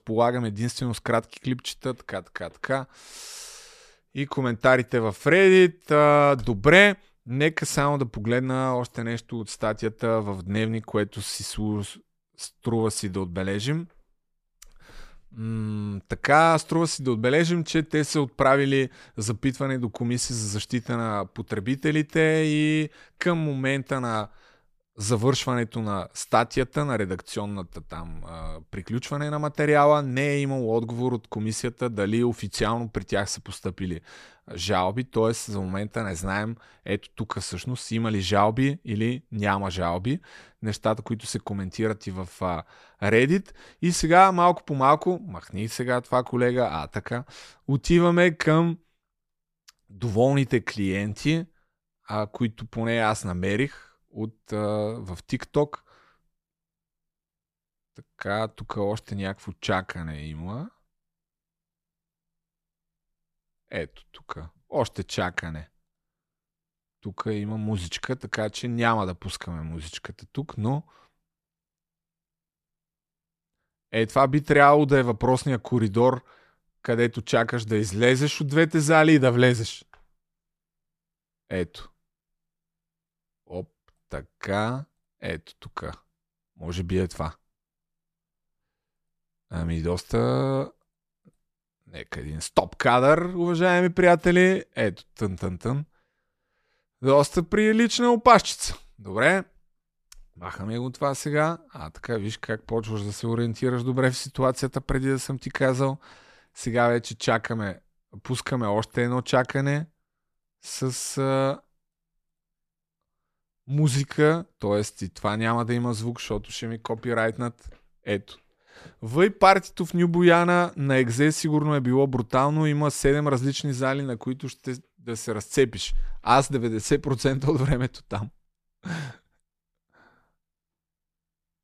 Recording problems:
none

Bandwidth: 14.5 kHz